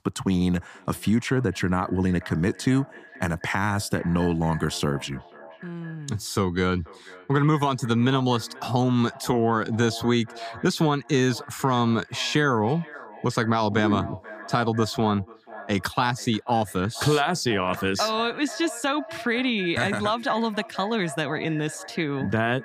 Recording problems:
echo of what is said; noticeable; throughout; 490 ms later, 15 dB below the speech

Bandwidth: 15 kHz